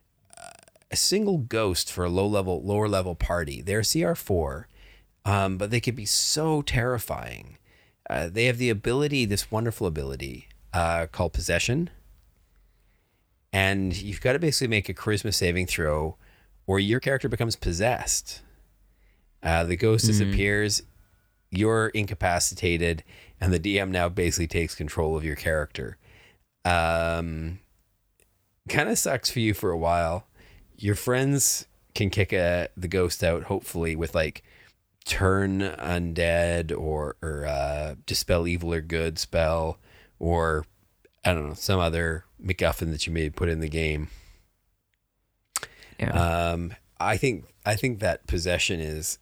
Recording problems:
uneven, jittery; strongly; from 11 to 43 s

